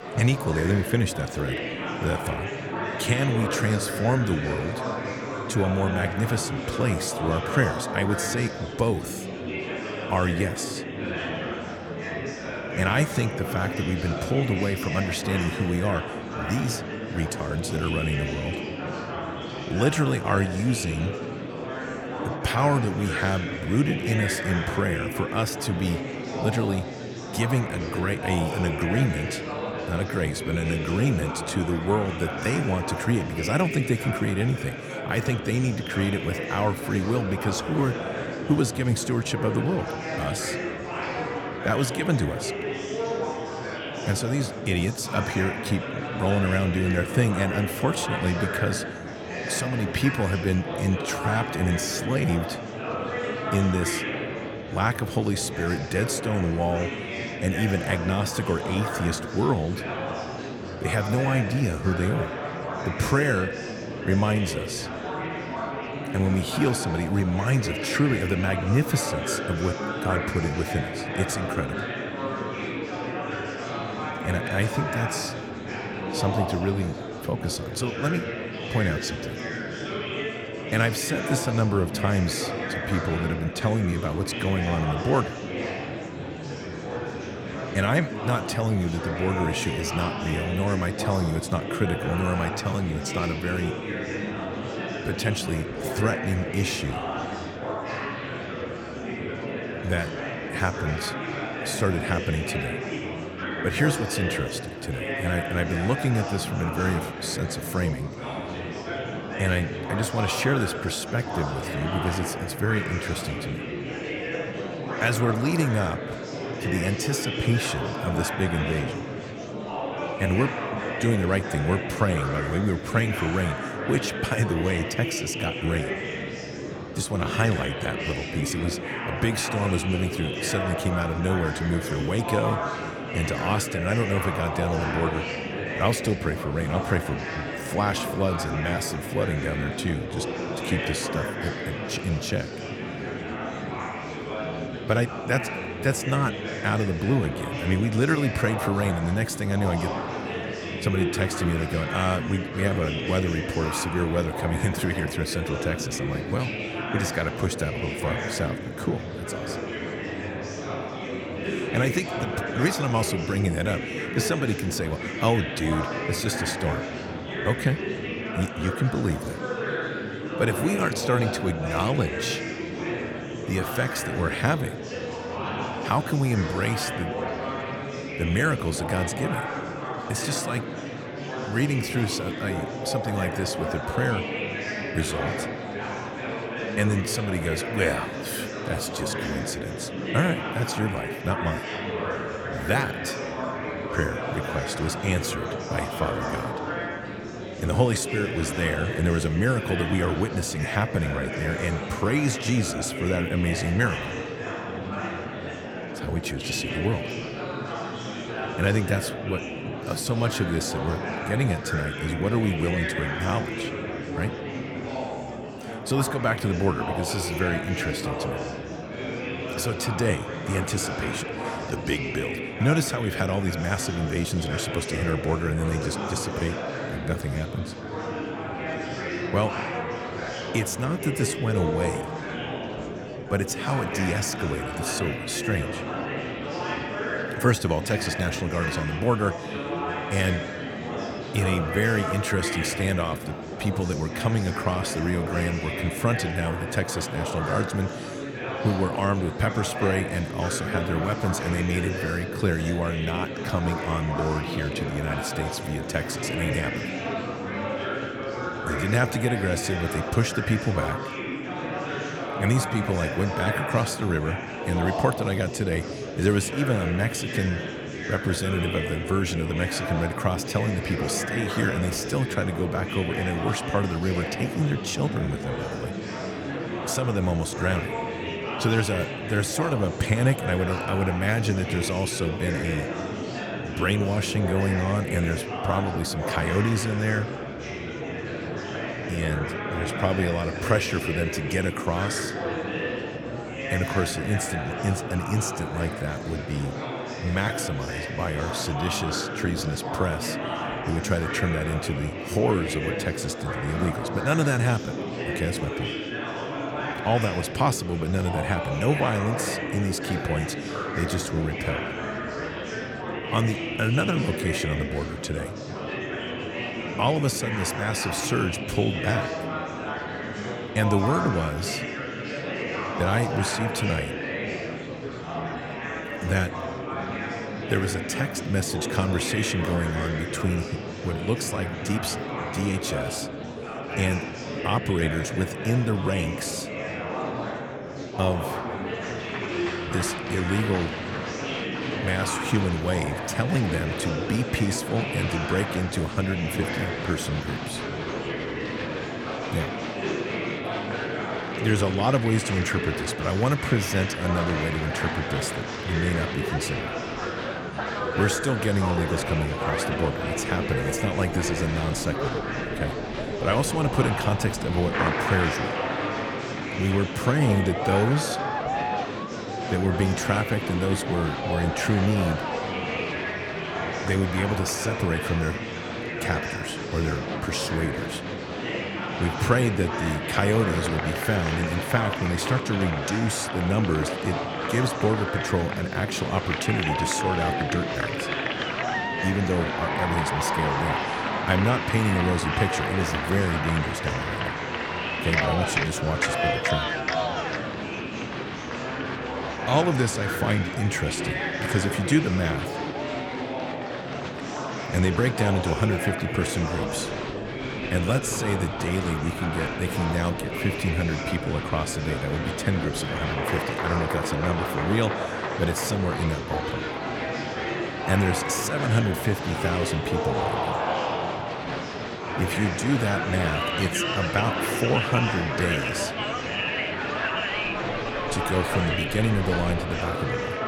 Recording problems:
murmuring crowd; loud; throughout; 3 dB below the speech

